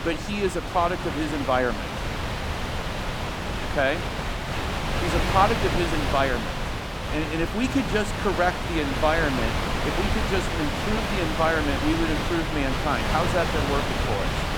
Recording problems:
wind noise on the microphone; heavy; 2 dB below the speech

